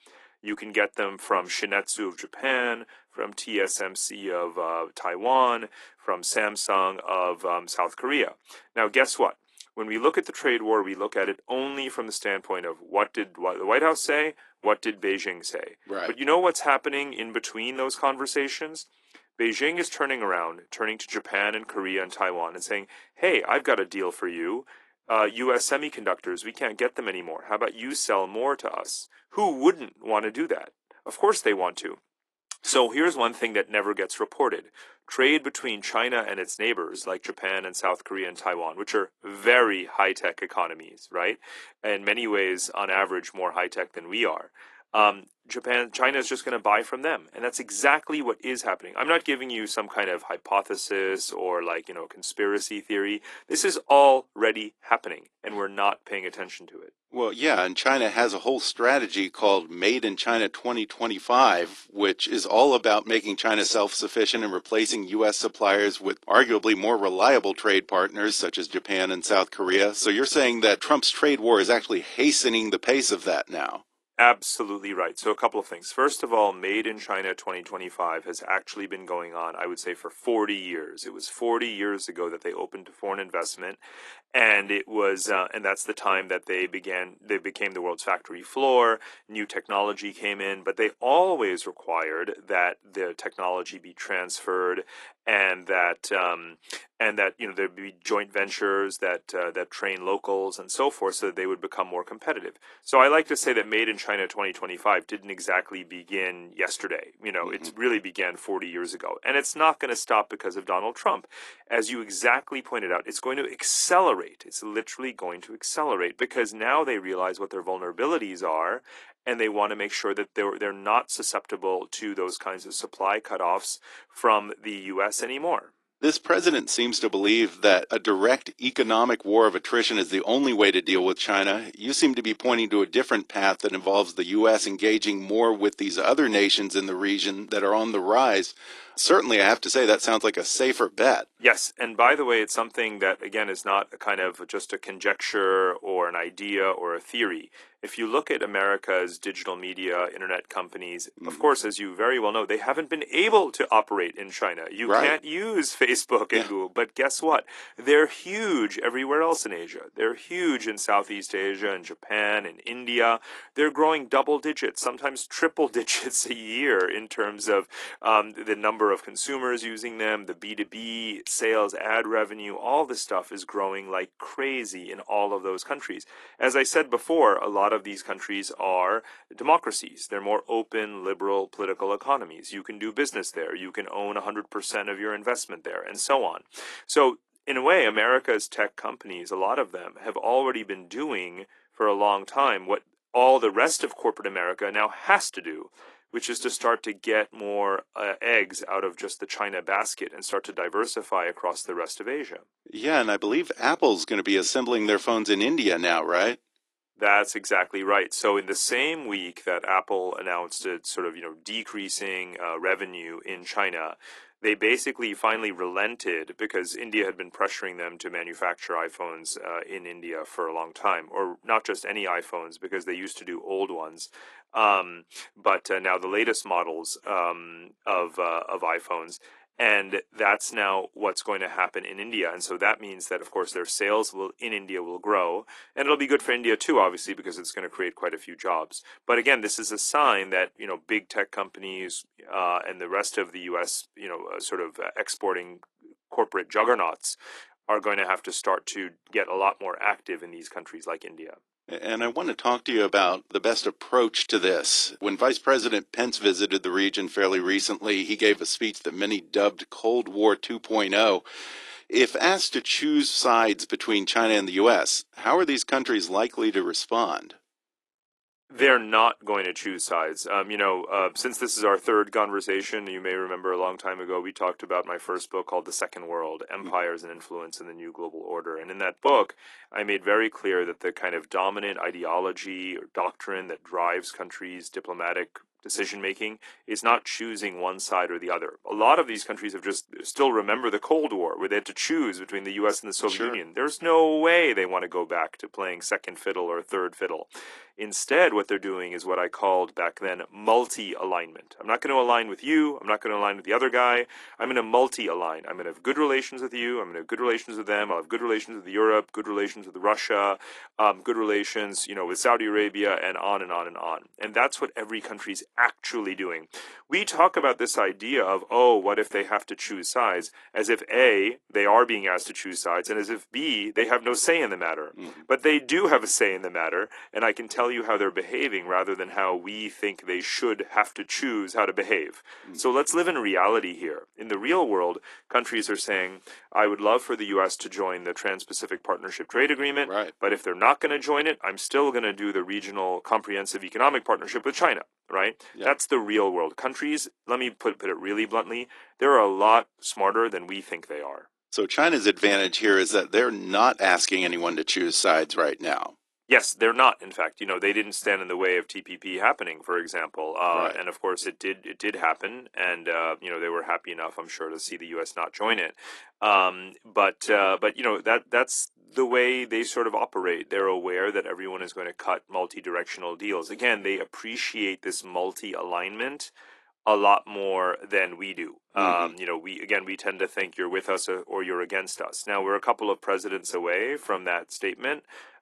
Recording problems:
thin; somewhat; fading below 300 Hz
garbled, watery; slightly; nothing above 11 kHz

